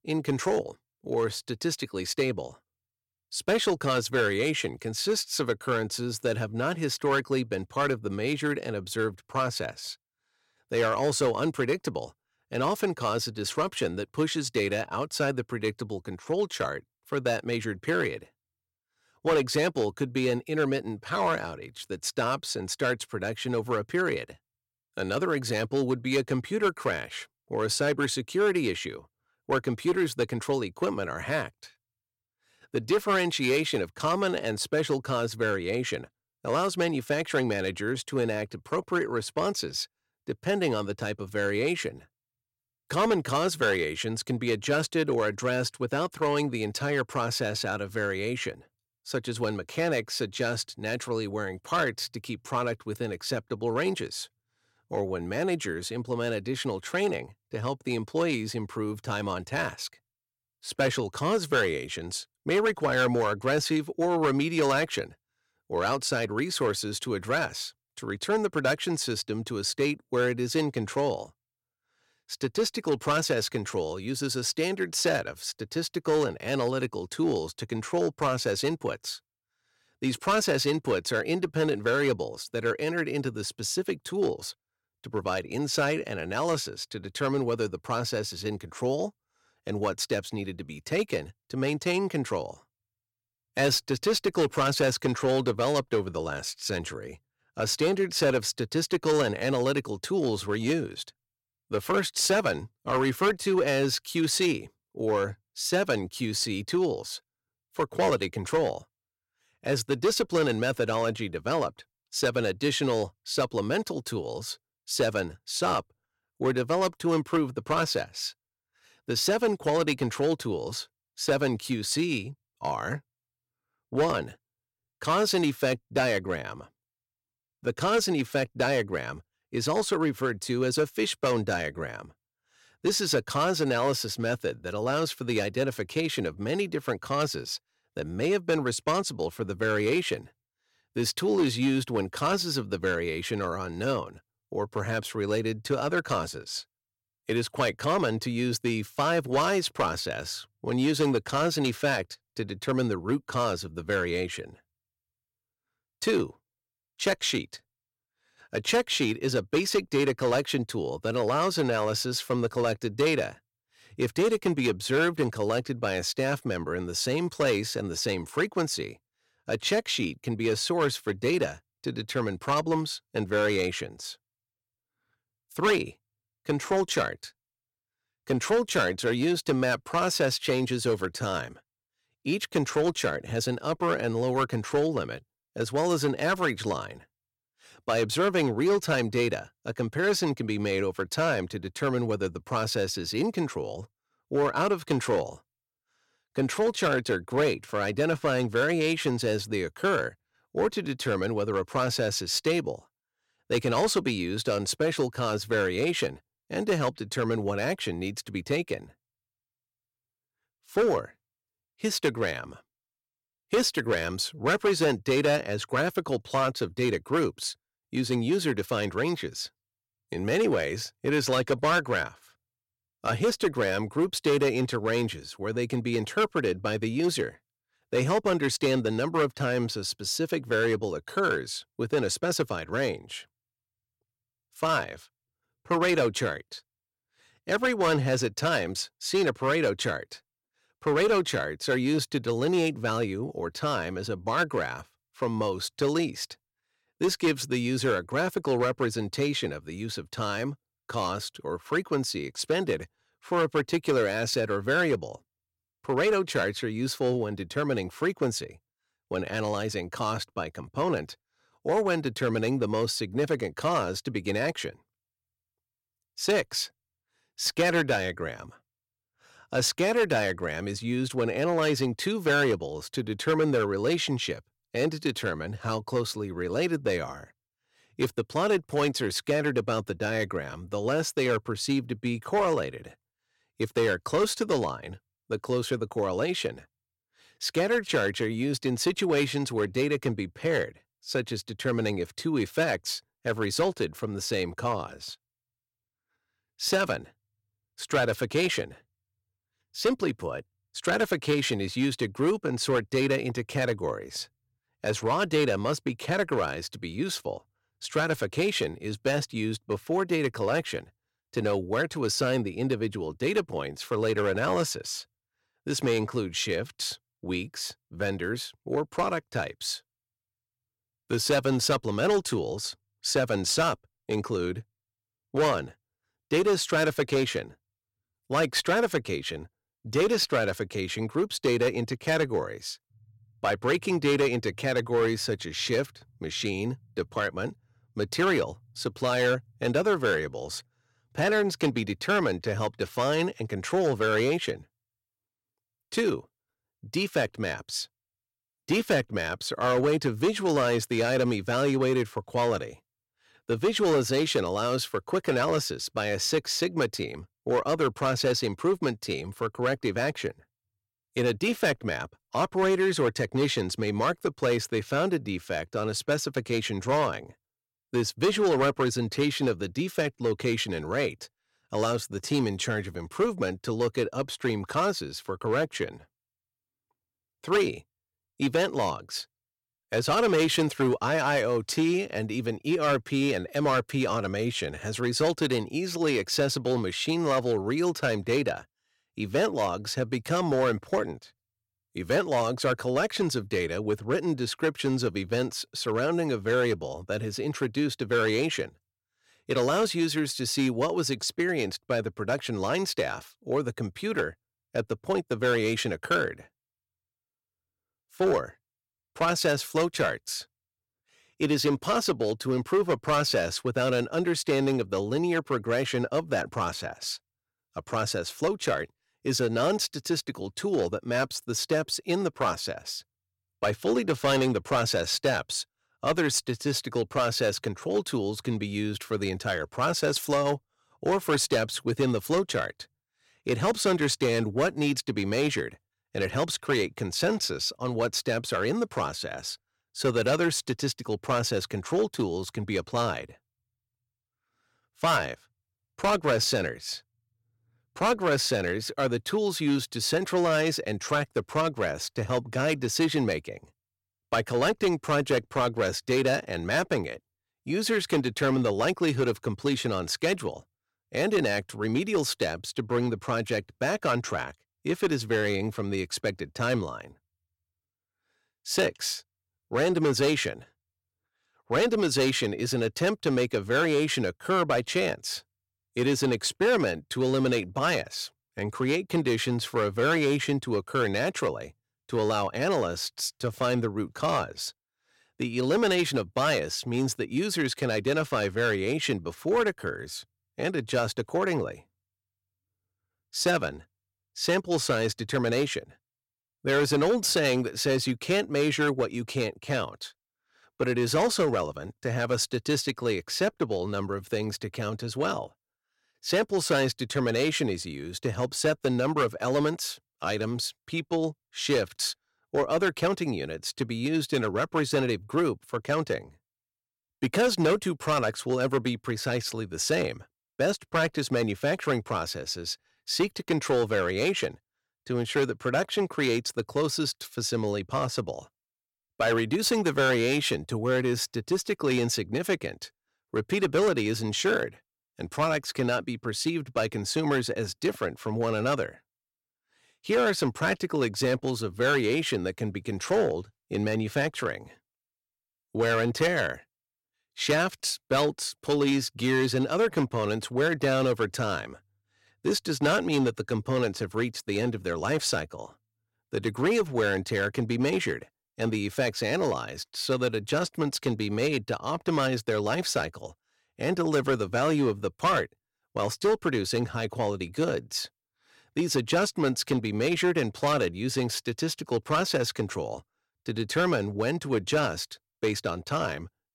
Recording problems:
distortion; slight; 4% of the sound clipped

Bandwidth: 16.5 kHz